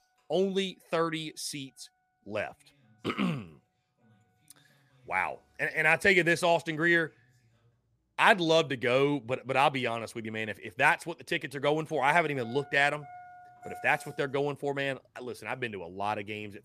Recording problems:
traffic noise; faint; throughout; 25 dB below the speech

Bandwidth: 14.5 kHz